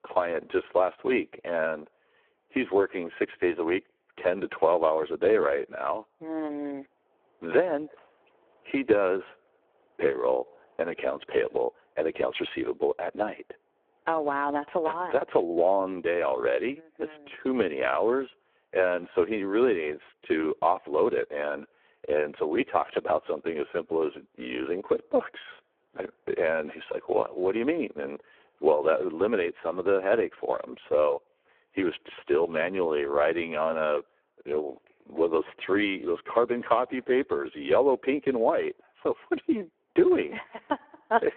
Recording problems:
phone-call audio; poor line

